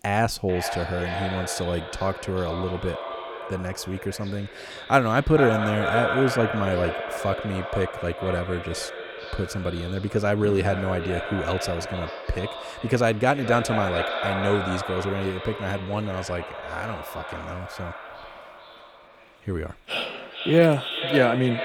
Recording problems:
echo of what is said; strong; throughout; 440 ms later, 6 dB below the speech

